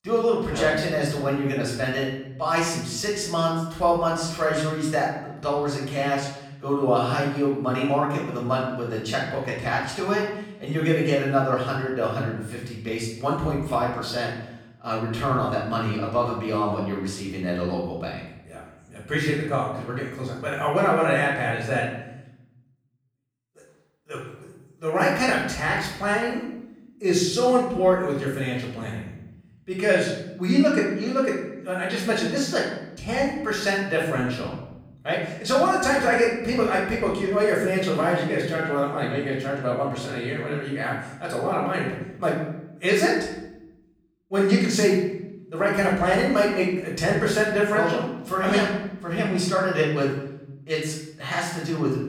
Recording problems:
off-mic speech; far
room echo; noticeable; dies away in 0.9 s

